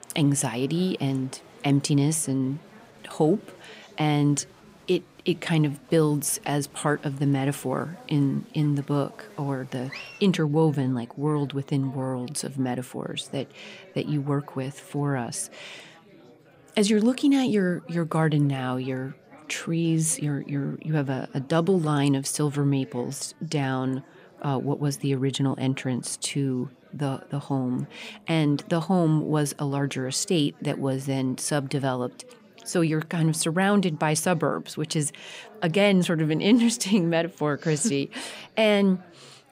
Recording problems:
murmuring crowd; faint; throughout; 25 dB below the speech

